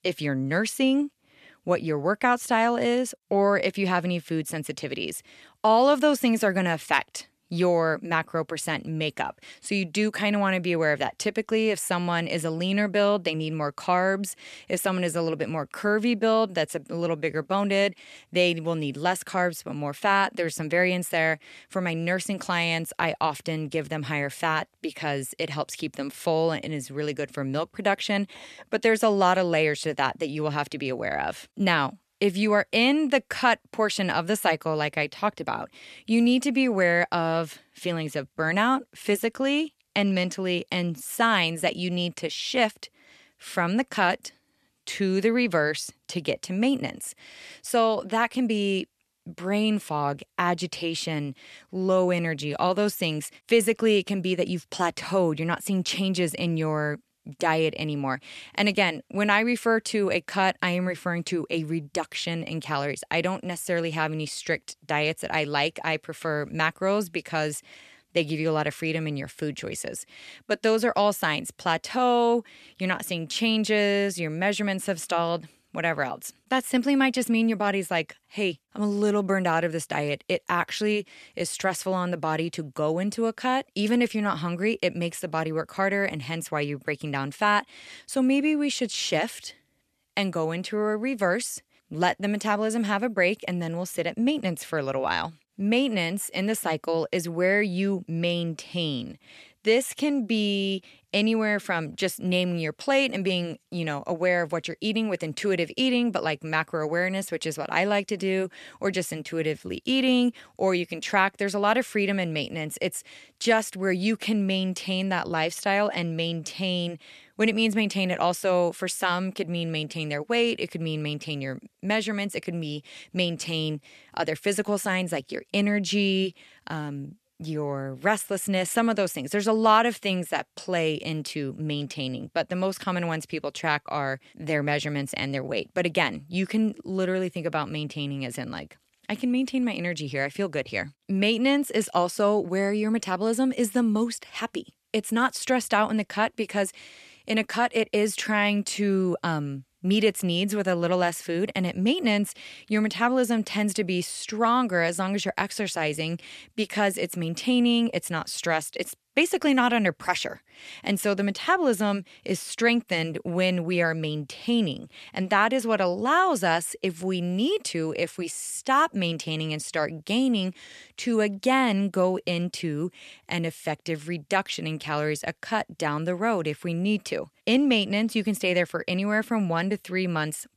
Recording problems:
none

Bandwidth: 13.5 kHz